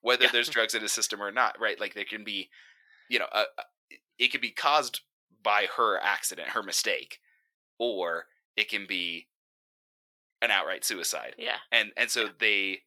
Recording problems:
thin; very; fading below 650 Hz

